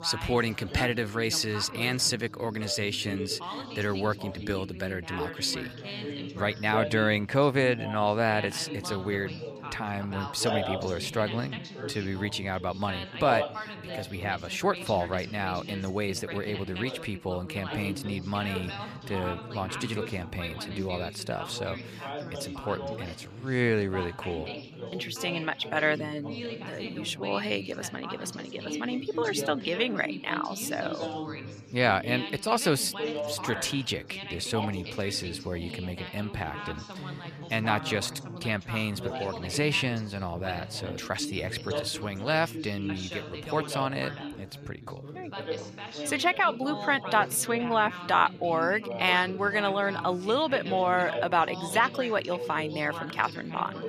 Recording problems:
background chatter; loud; throughout; 4 voices, 8 dB below the speech

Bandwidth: 14.5 kHz